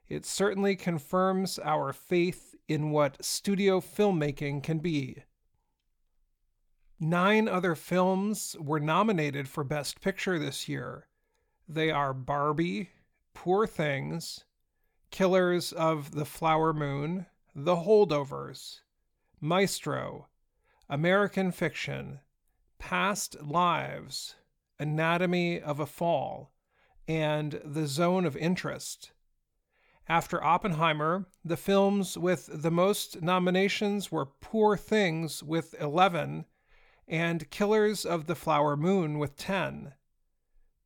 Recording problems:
none

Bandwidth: 18.5 kHz